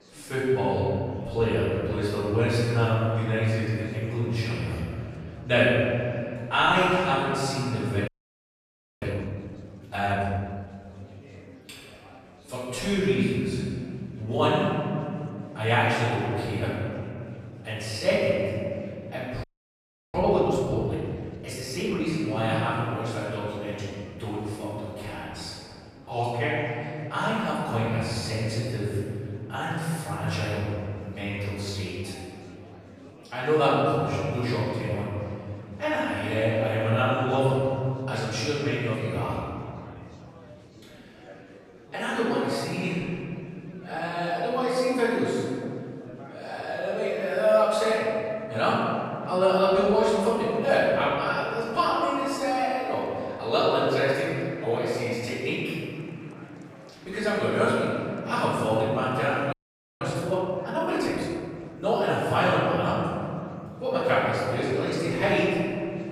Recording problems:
room echo; strong; dies away in 2.5 s
off-mic speech; far
murmuring crowd; faint; throughout; 20 dB below the speech
audio freezing; at 8 s for 1 s, at 19 s for 0.5 s and at 1:00

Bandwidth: 15 kHz